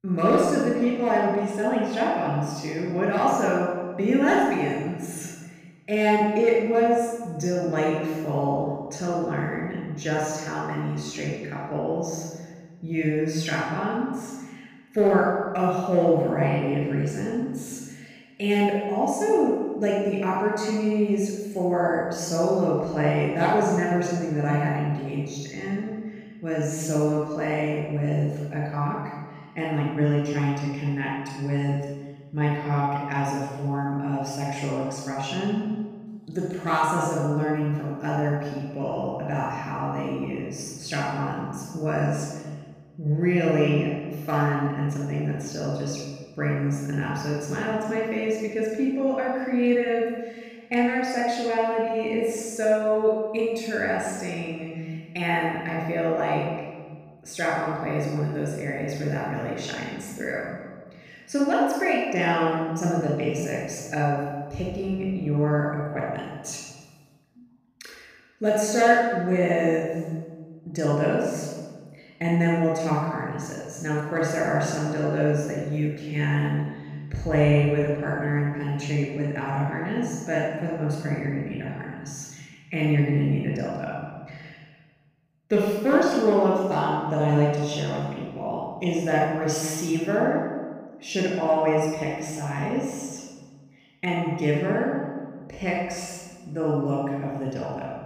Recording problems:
room echo; strong; dies away in 1.4 s
off-mic speech; far

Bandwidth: 15 kHz